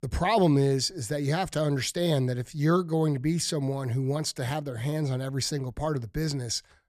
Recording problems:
none

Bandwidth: 14.5 kHz